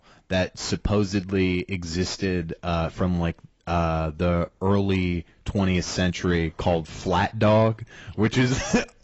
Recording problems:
garbled, watery; badly; nothing above 7.5 kHz
distortion; slight; 10 dB below the speech

